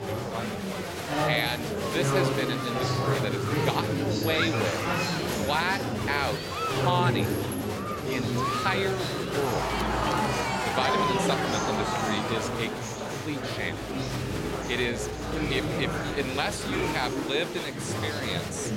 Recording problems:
murmuring crowd; very loud; throughout; 2 dB above the speech

